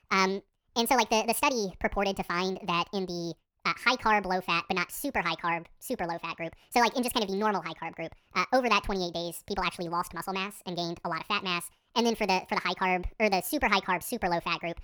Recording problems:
wrong speed and pitch; too fast and too high; 1.7 times normal speed

